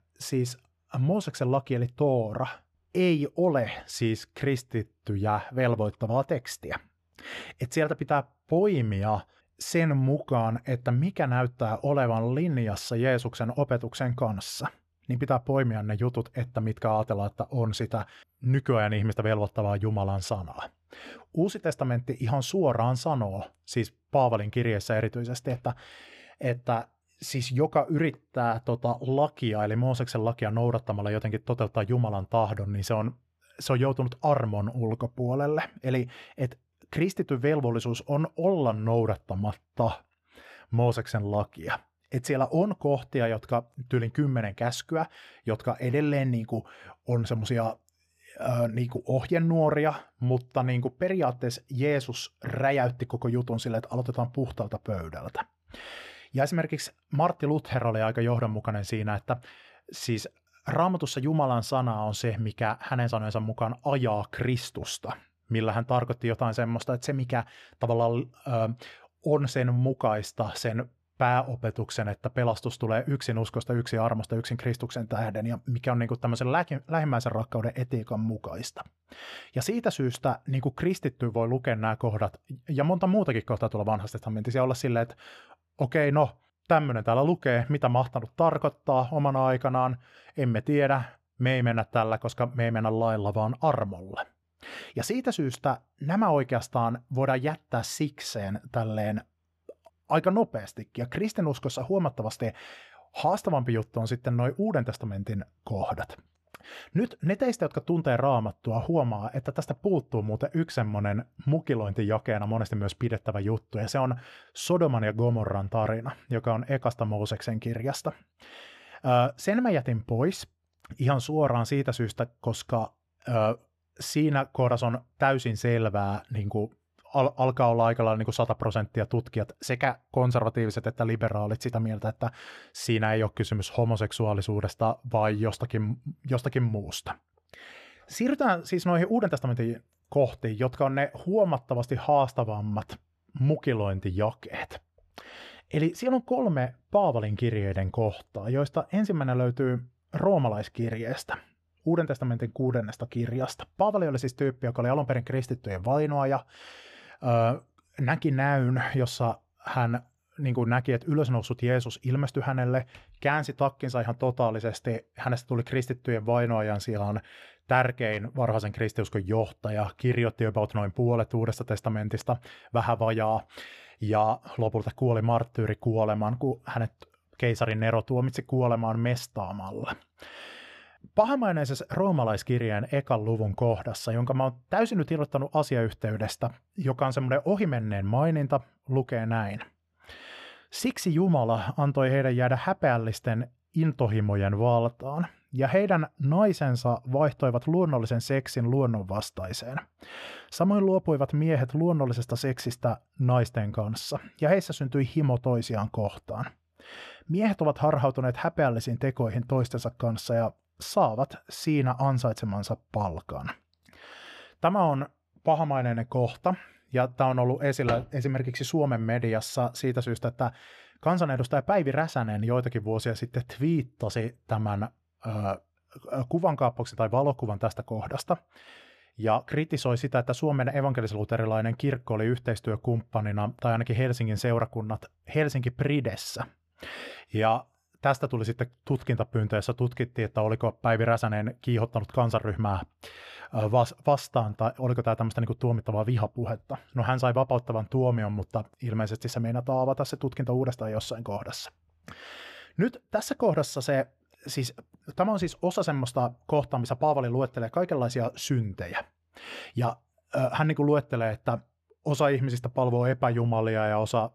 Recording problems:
muffled; slightly; fading above 2.5 kHz

